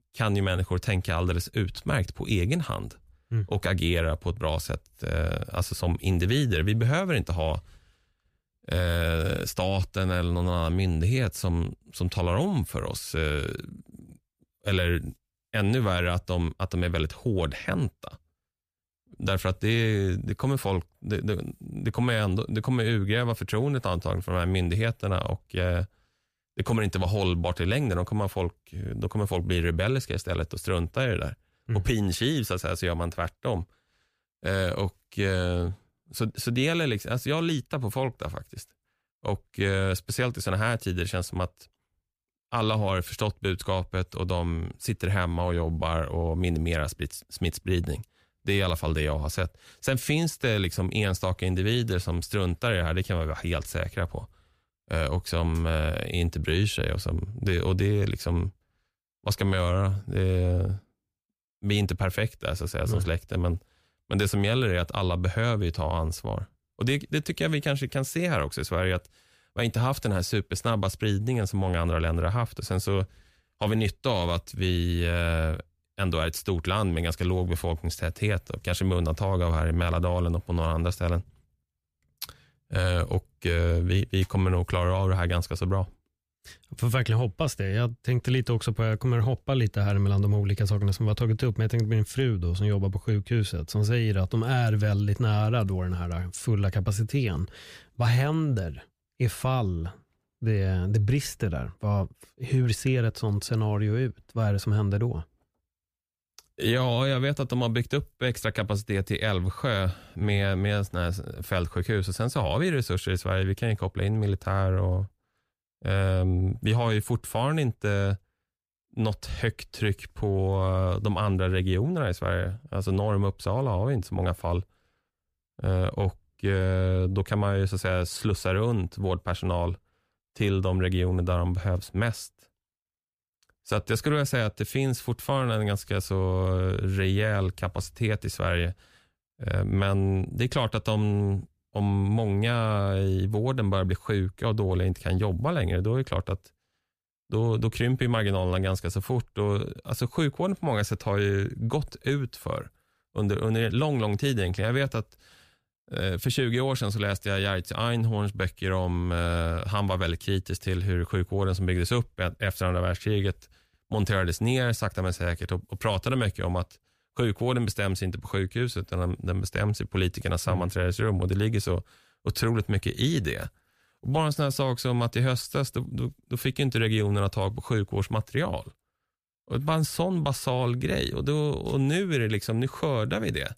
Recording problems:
none

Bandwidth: 15 kHz